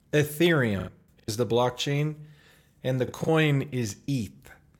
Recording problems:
choppy; very; at 1 s and at 3 s; 14% of the speech affected

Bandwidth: 17.5 kHz